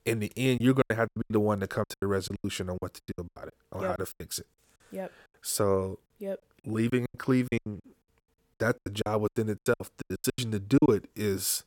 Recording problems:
choppy; very; 19% of the speech affected

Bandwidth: 17 kHz